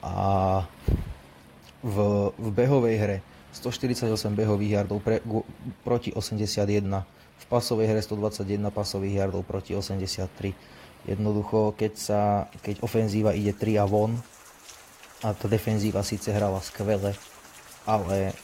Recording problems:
garbled, watery; slightly; nothing above 15.5 kHz
rain or running water; faint; throughout; 20 dB below the speech

